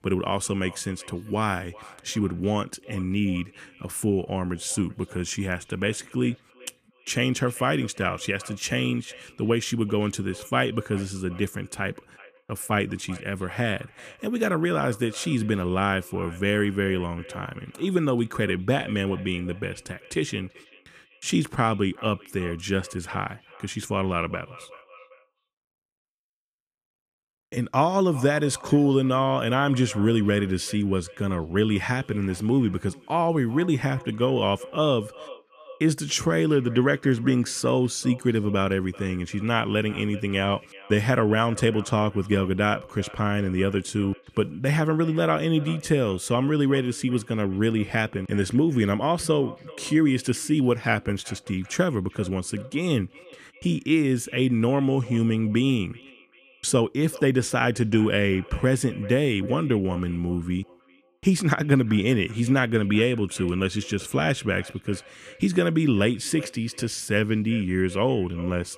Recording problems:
echo of what is said; faint; throughout; 390 ms later, 20 dB below the speech

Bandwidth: 14.5 kHz